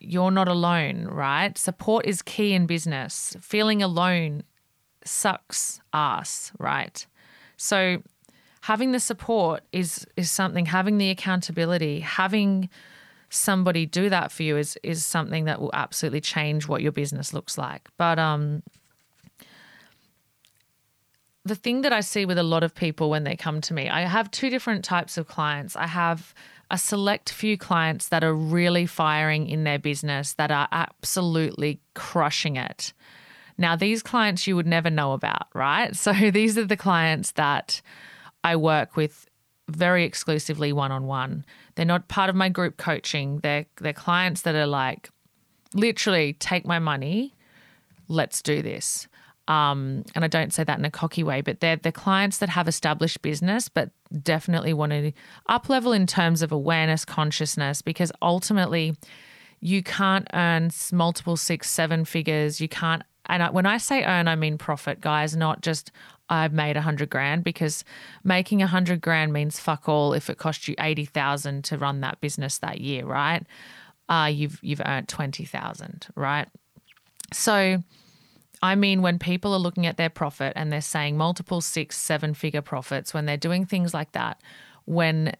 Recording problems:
none

